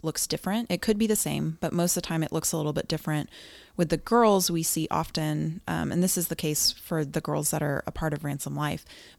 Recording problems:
none

